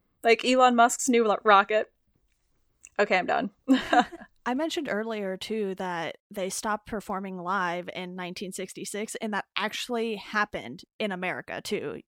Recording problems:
none

